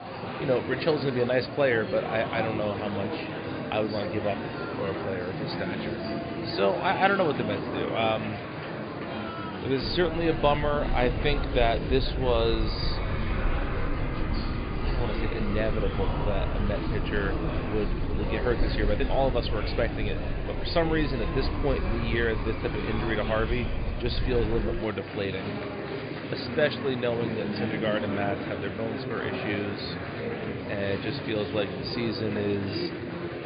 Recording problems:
high frequencies cut off; severe; nothing above 5 kHz
murmuring crowd; loud; throughout; 4 dB below the speech
low rumble; faint; from 10 to 25 s; 20 dB below the speech

